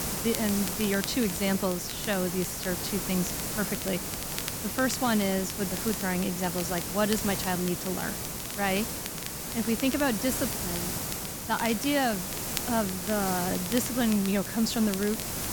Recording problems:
hiss; loud; throughout; 3 dB below the speech
crackle, like an old record; noticeable; 15 dB below the speech

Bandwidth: 18.5 kHz